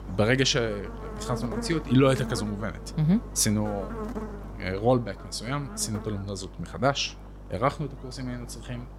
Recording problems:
electrical hum; noticeable; throughout; 50 Hz, 15 dB below the speech

